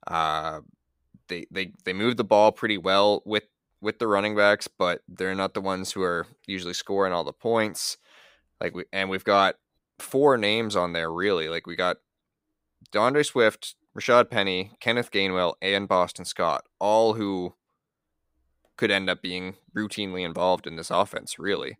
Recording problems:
none

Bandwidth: 15.5 kHz